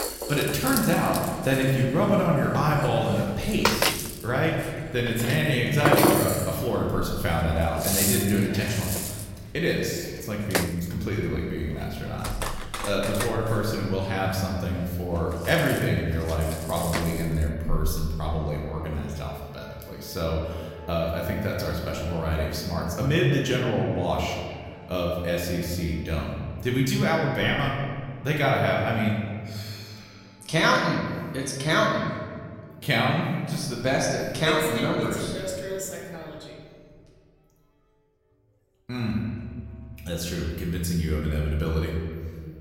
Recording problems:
room echo; noticeable; dies away in 1.6 s
off-mic speech; somewhat distant
background music; loud; throughout; 4 dB below the speech

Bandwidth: 16 kHz